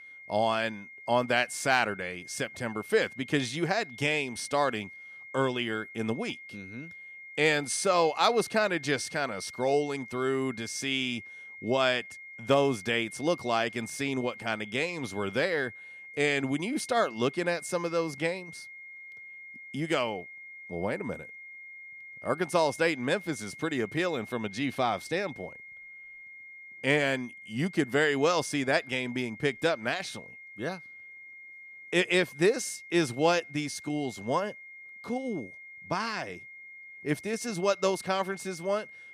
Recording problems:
high-pitched whine; noticeable; throughout; 2 kHz, 15 dB below the speech

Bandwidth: 15 kHz